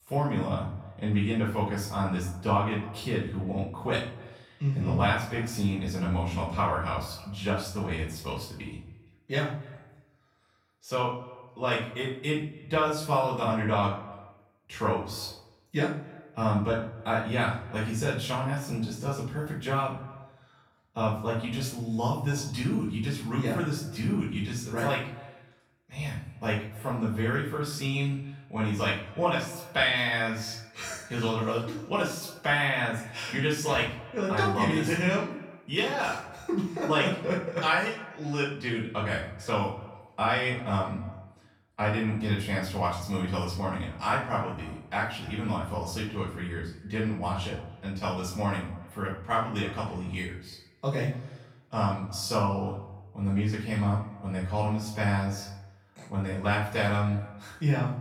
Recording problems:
off-mic speech; far
room echo; noticeable; dies away in 0.5 s
echo of what is said; faint; throughout; 270 ms later, 20 dB below the speech

